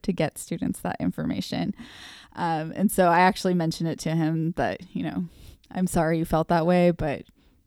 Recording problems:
none

